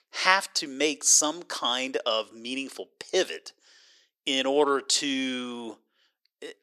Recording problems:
thin; very slightly; fading below 350 Hz

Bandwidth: 13.5 kHz